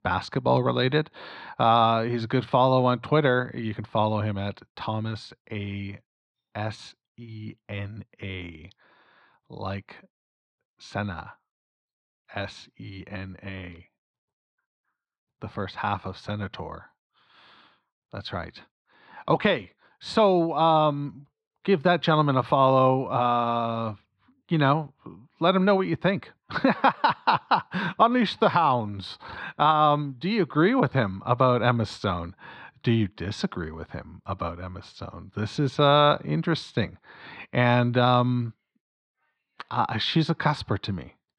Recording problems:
muffled; very slightly; fading above 4.5 kHz

